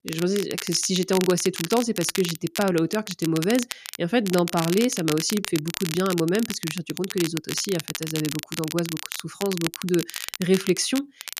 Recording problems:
crackle, like an old record; loud; 7 dB below the speech

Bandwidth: 14.5 kHz